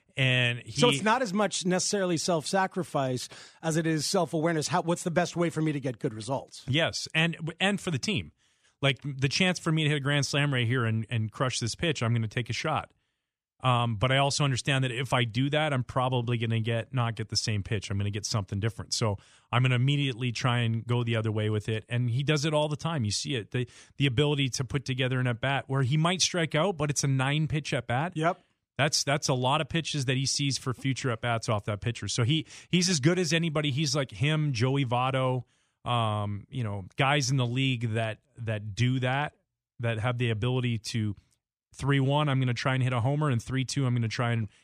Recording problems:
none

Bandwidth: 14.5 kHz